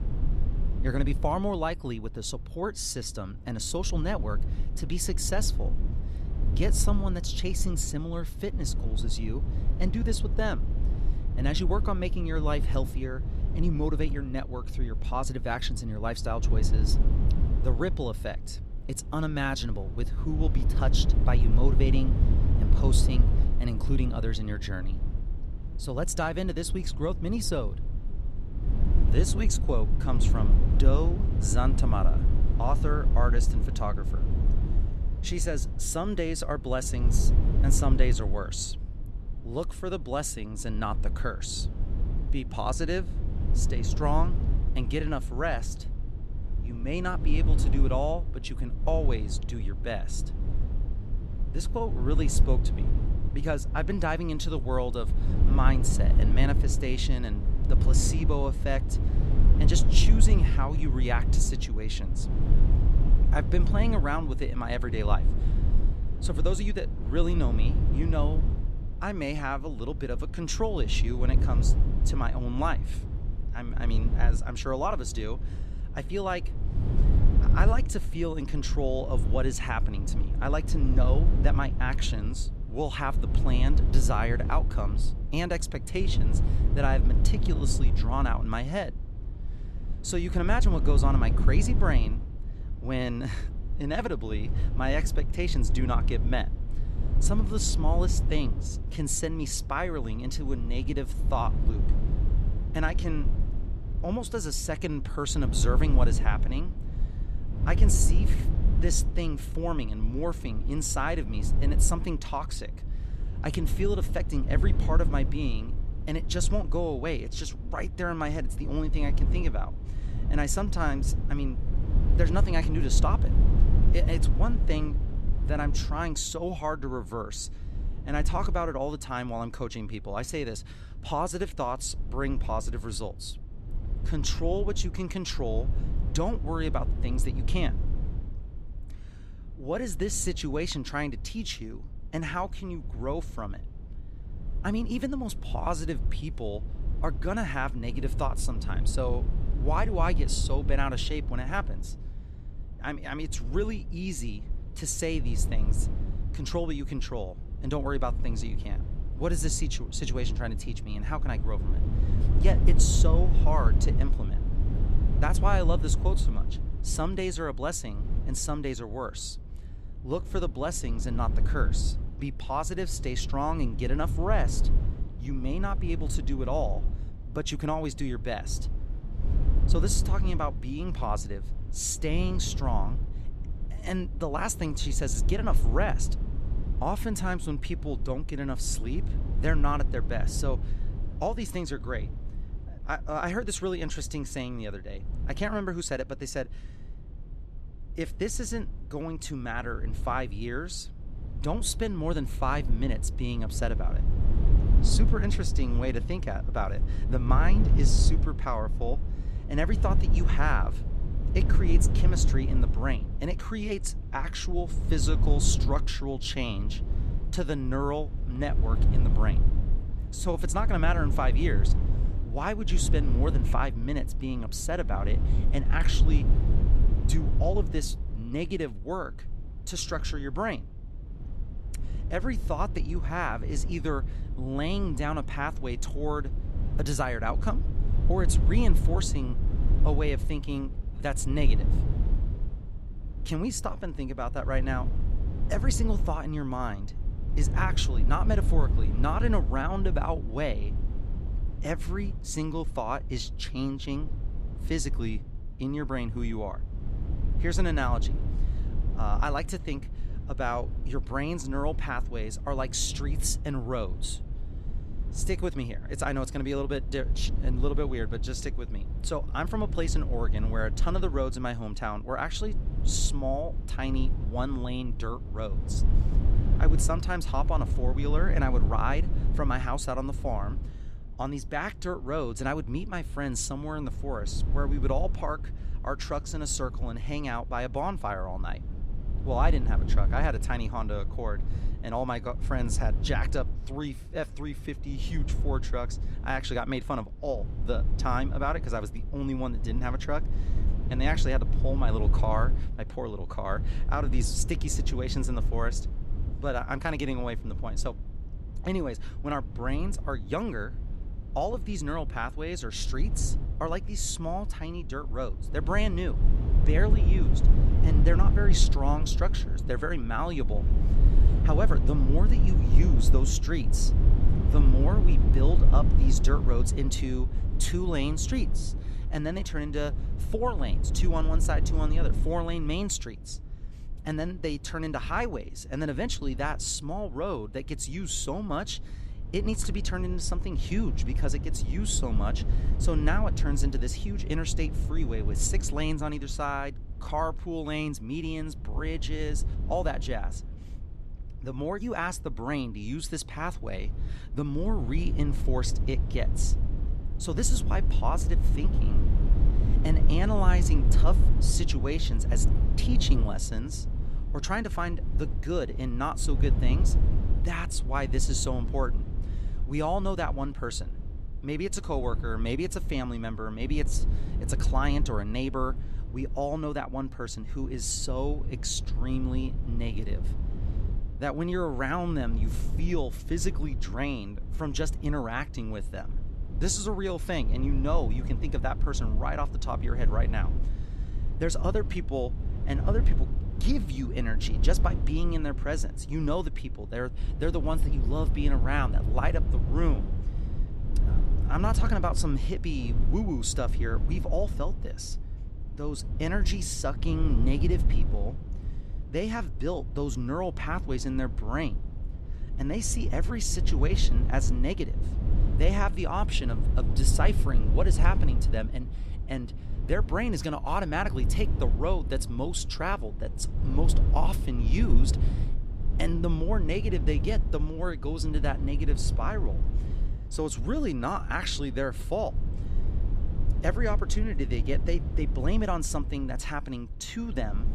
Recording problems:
low rumble; noticeable; throughout; 10 dB below the speech

